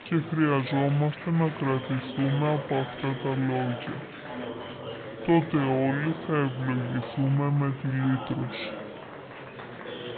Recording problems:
high frequencies cut off; severe; nothing above 4 kHz
wrong speed and pitch; too slow and too low; 0.6 times normal speed
murmuring crowd; noticeable; throughout; 10 dB below the speech

